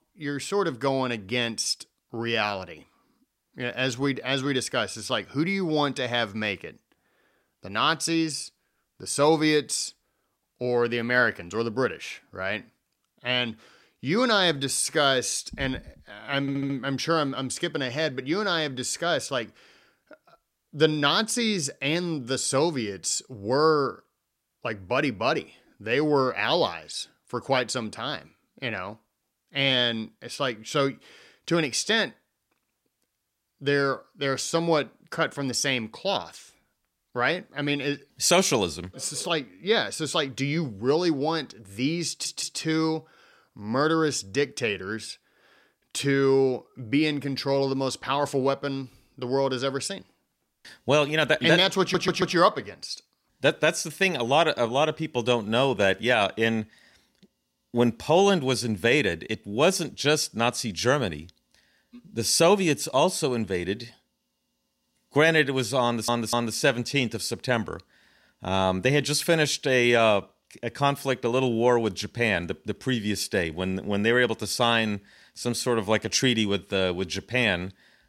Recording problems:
audio stuttering; 4 times, first at 16 s

